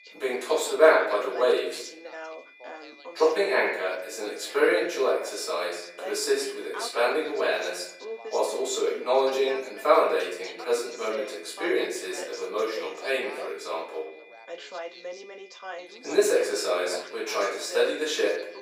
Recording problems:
off-mic speech; far
thin; very; fading below 400 Hz
room echo; noticeable; dies away in 0.8 s
background chatter; noticeable; throughout; 2 voices, 15 dB below the speech
high-pitched whine; faint; throughout; 2.5 kHz, 25 dB below the speech

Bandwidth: 15.5 kHz